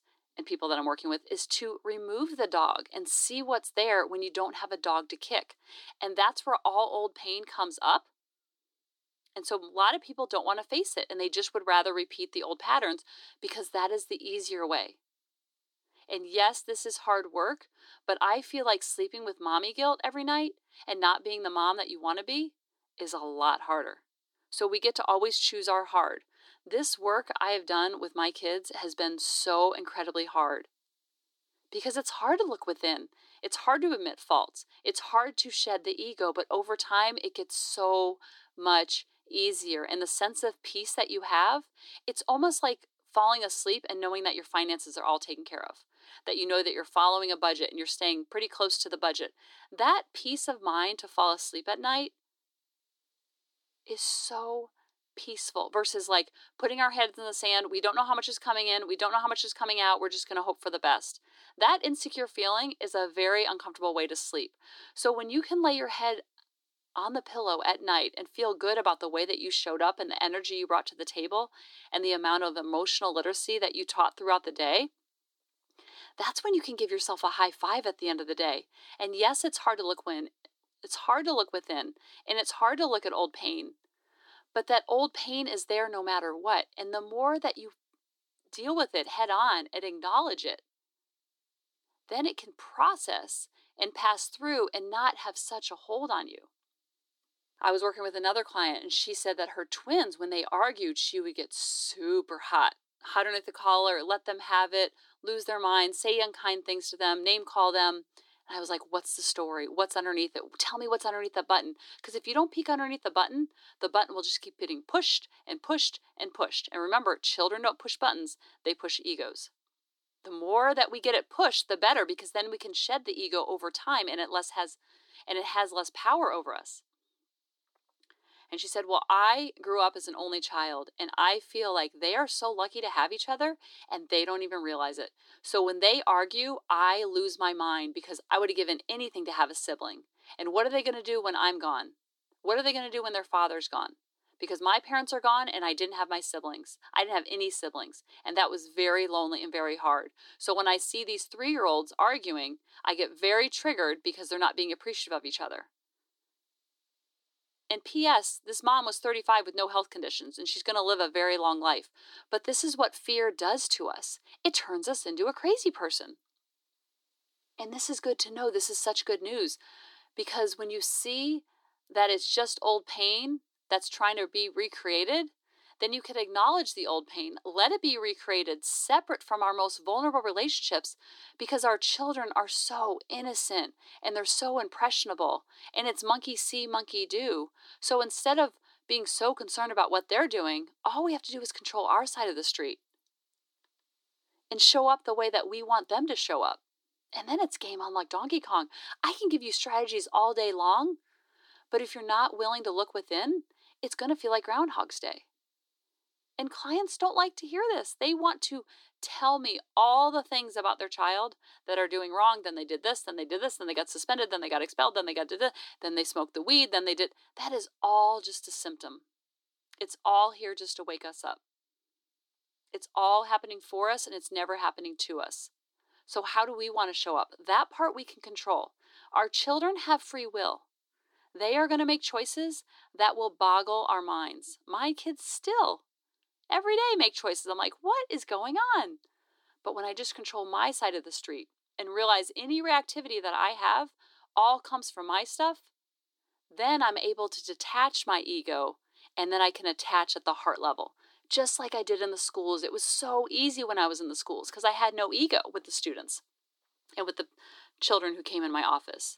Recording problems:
thin; somewhat; fading below 300 Hz

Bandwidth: 18 kHz